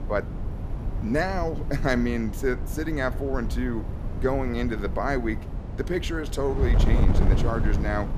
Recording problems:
wind noise on the microphone; heavy; 10 dB below the speech
electrical hum; faint; throughout; 50 Hz, 25 dB below the speech

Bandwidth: 15 kHz